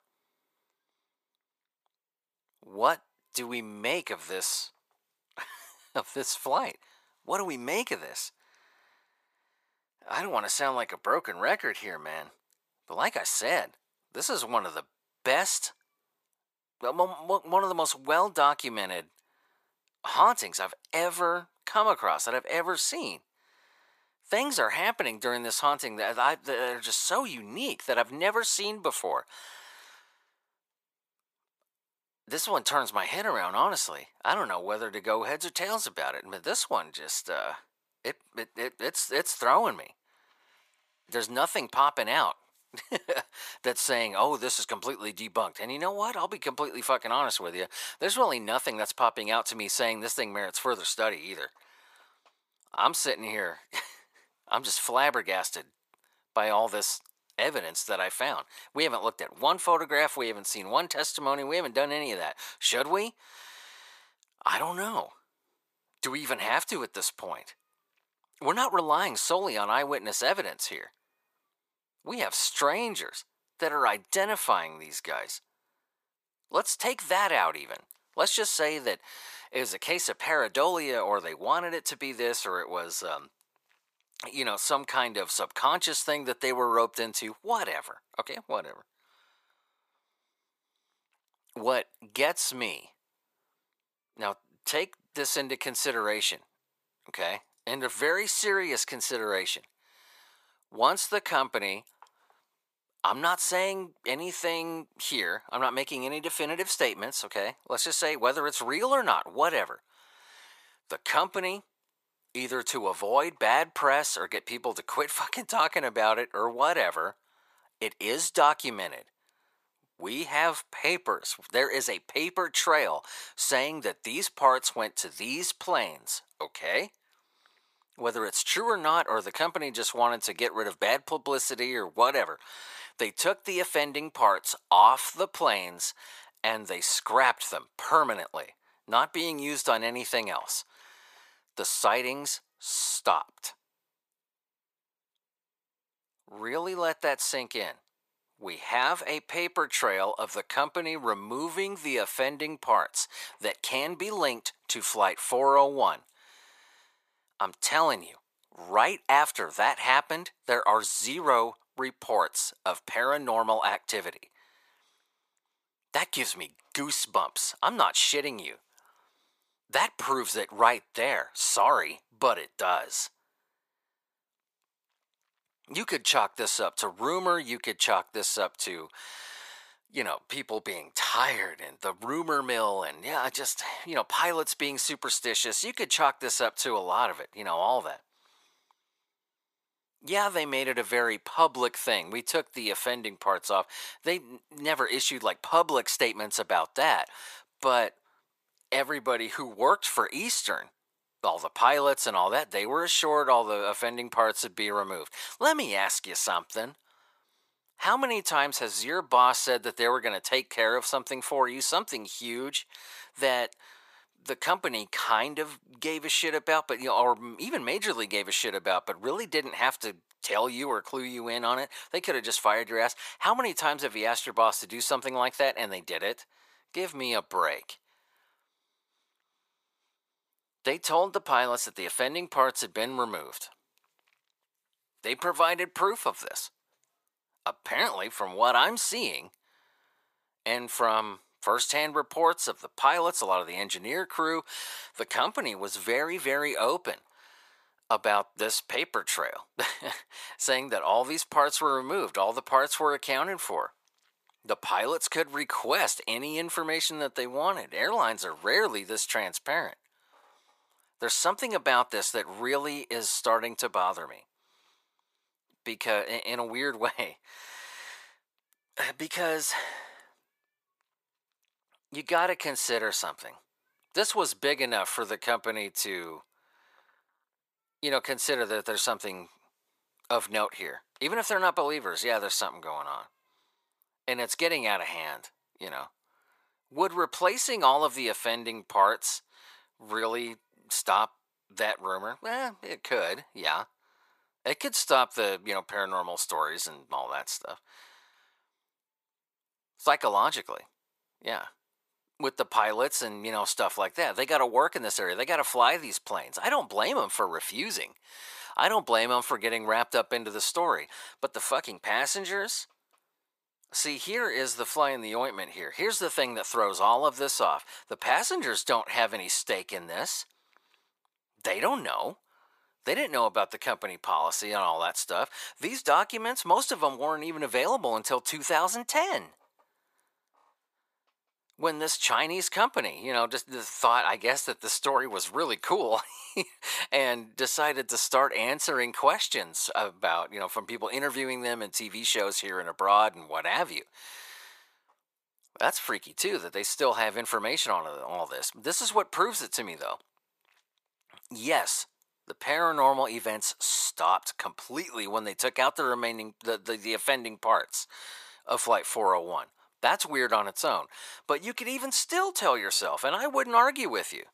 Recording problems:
thin; very; fading below 500 Hz

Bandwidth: 14.5 kHz